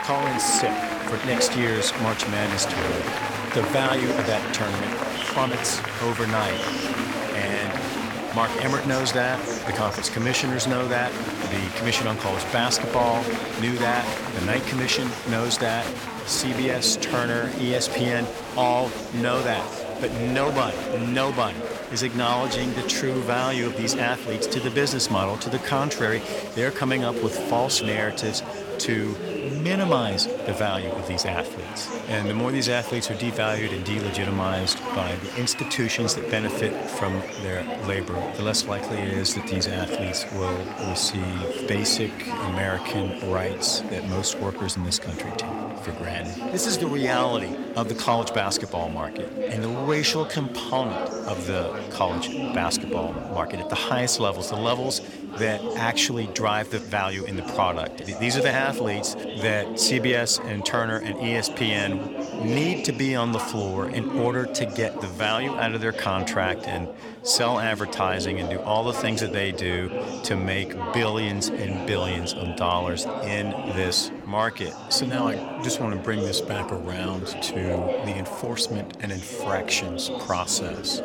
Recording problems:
chatter from many people; loud; throughout; 4 dB below the speech

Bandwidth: 17 kHz